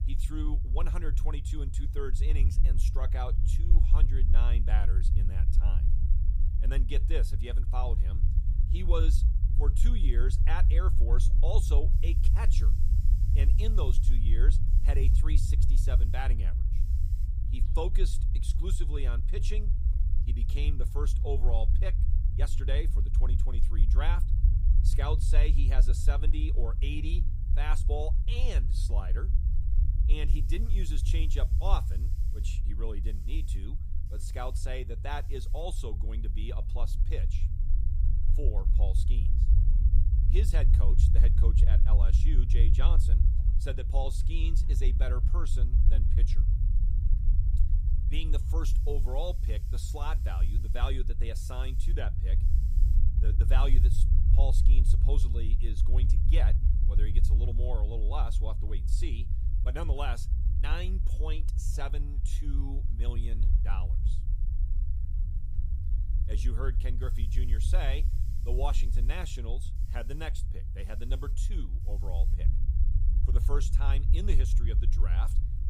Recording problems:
low rumble; loud; throughout; 7 dB below the speech
hiss; faint; throughout; 20 dB below the speech

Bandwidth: 15.5 kHz